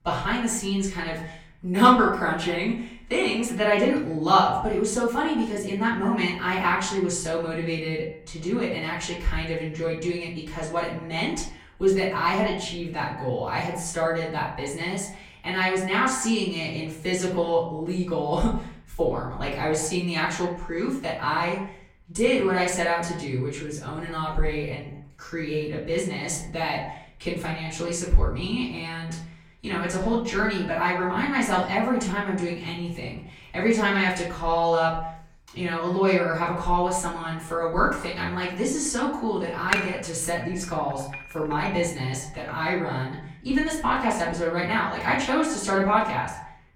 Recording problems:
off-mic speech; far
echo of what is said; noticeable; throughout; 100 ms later, 15 dB below the speech
room echo; slight; dies away in 0.4 s
clattering dishes; noticeable; from 40 to 41 s; peak level with the speech

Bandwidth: 16.5 kHz